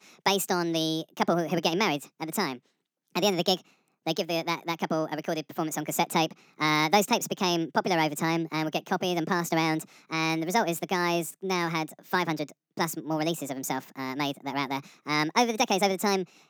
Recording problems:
wrong speed and pitch; too fast and too high; 1.5 times normal speed

